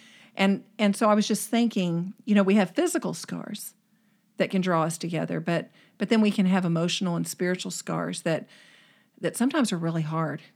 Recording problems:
none

